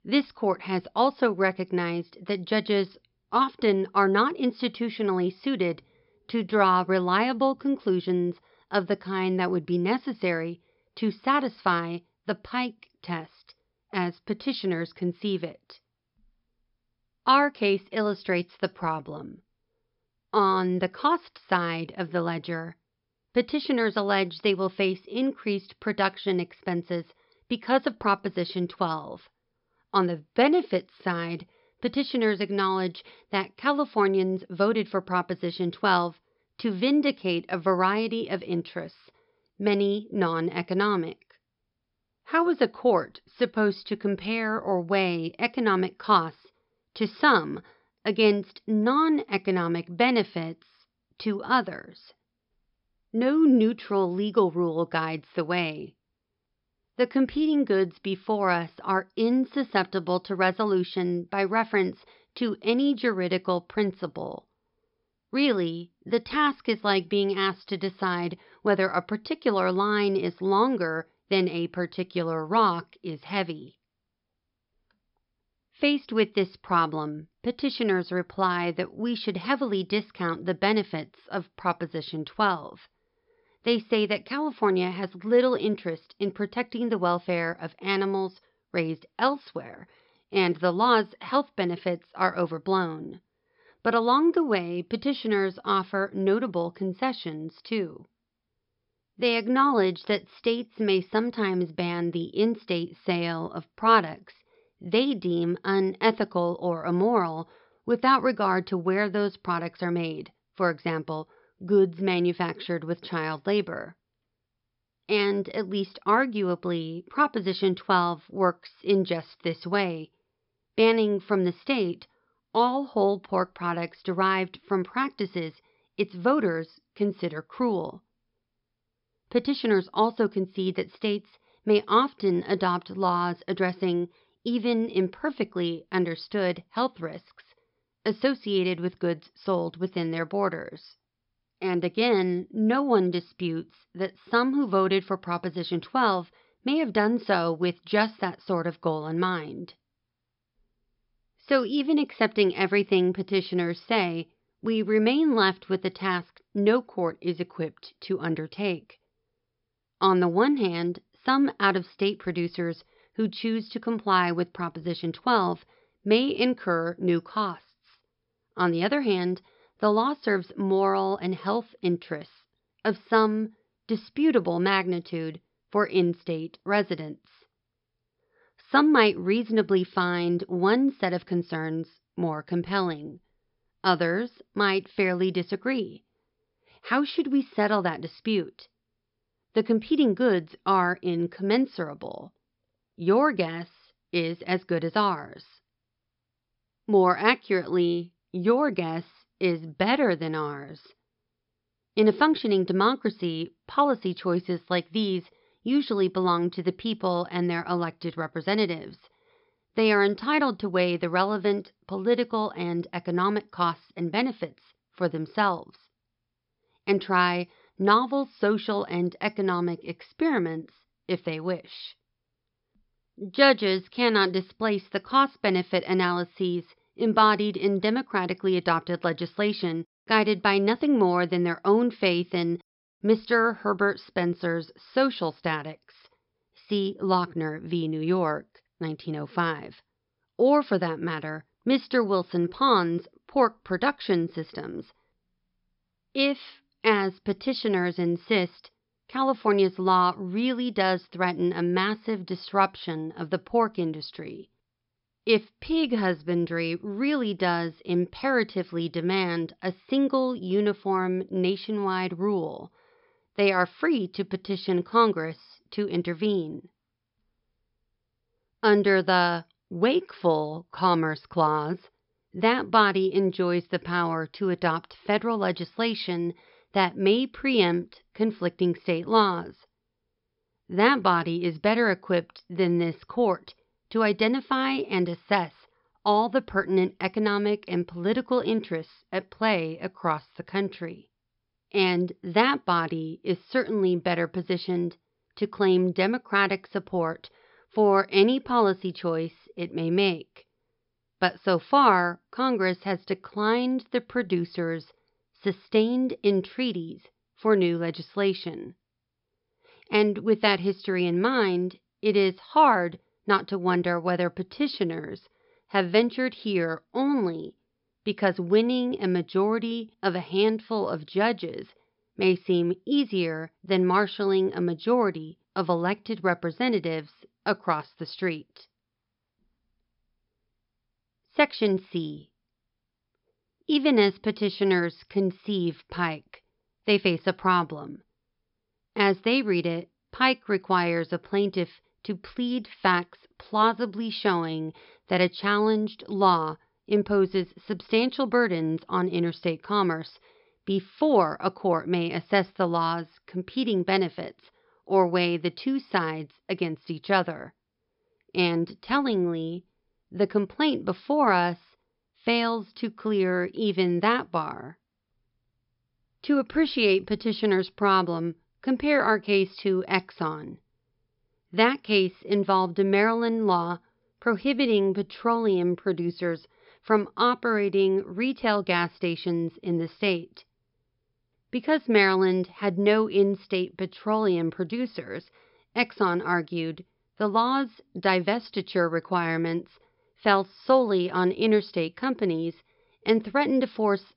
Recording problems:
high frequencies cut off; noticeable; nothing above 5.5 kHz

